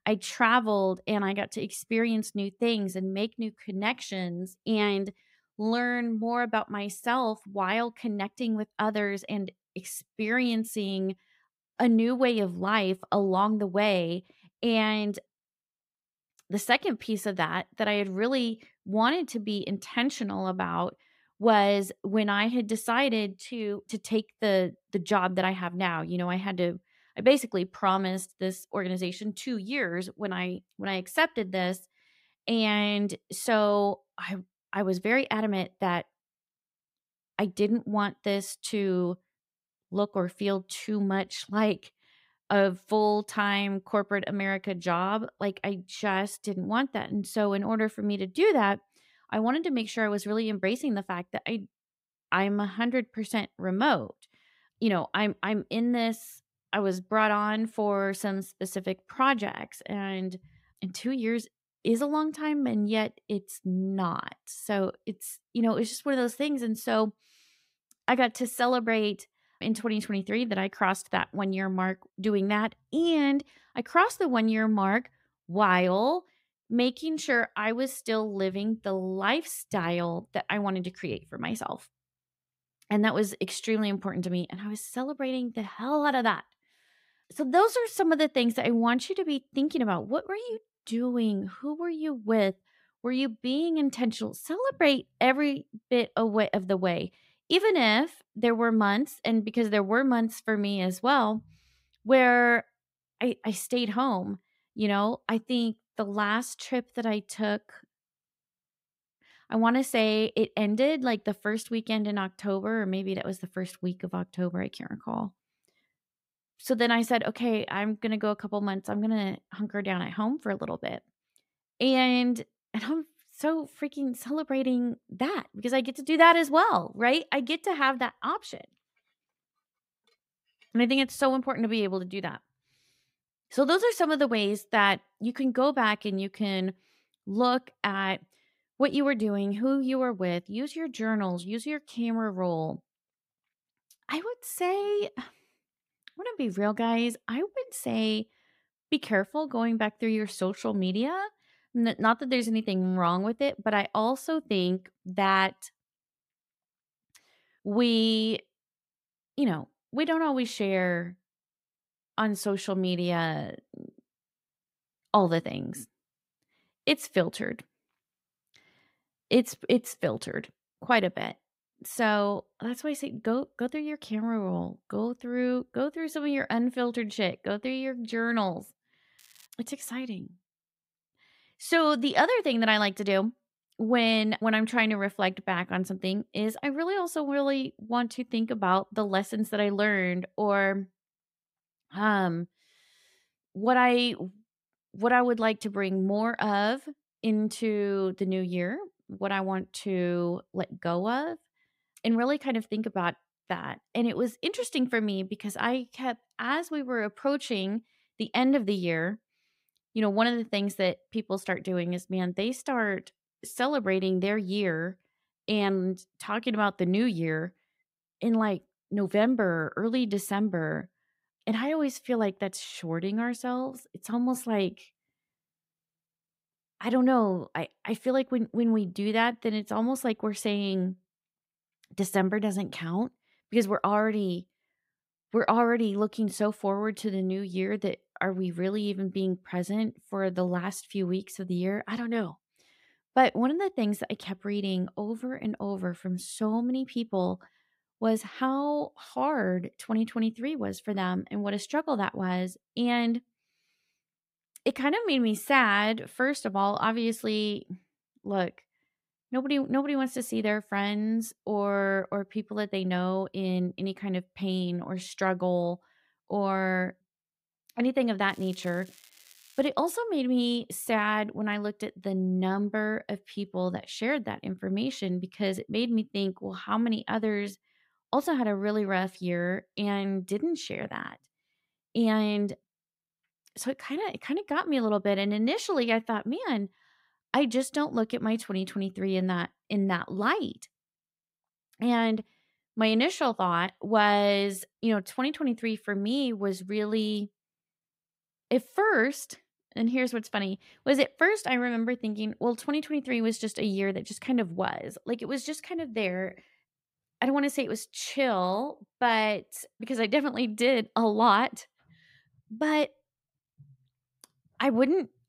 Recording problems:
crackling; faint; at 2:59 and from 4:28 to 4:30; 25 dB below the speech

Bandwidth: 15.5 kHz